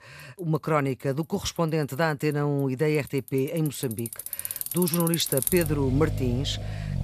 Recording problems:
traffic noise; loud; throughout; 4 dB below the speech

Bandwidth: 14.5 kHz